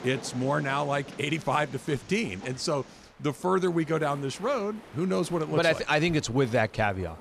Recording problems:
train or aircraft noise; noticeable; throughout; 20 dB below the speech

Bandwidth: 15 kHz